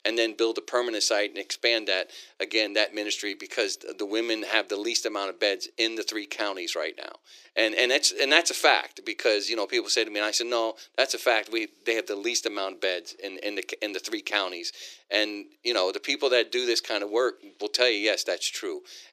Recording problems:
thin; very; fading below 350 Hz

